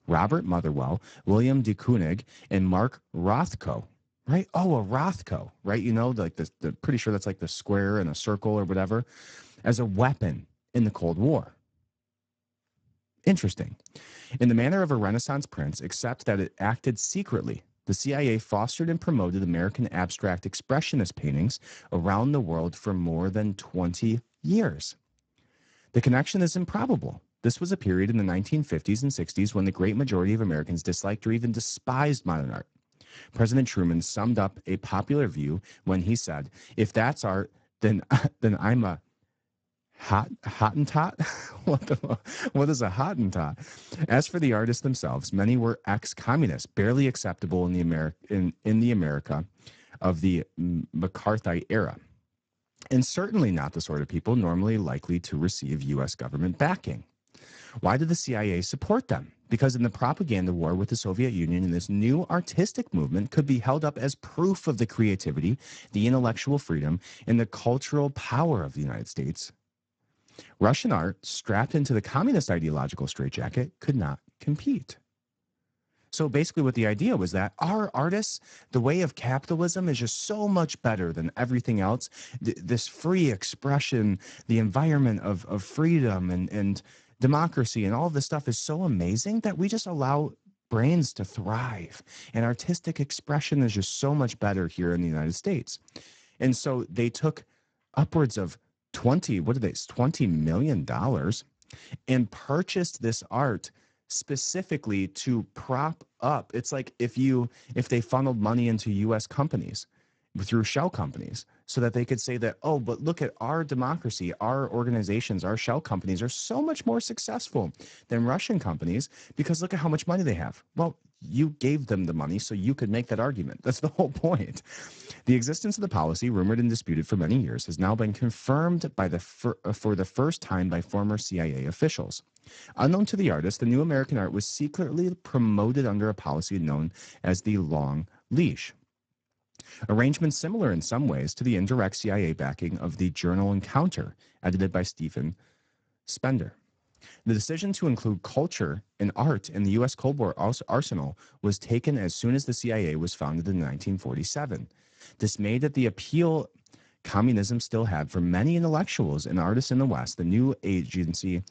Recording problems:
garbled, watery; badly; nothing above 7.5 kHz

